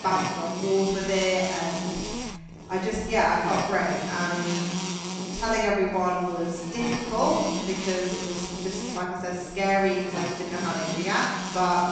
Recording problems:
off-mic speech; far
room echo; noticeable; dies away in 1.4 s
high frequencies cut off; noticeable; nothing above 8 kHz
electrical hum; loud; throughout; 60 Hz, 7 dB below the speech

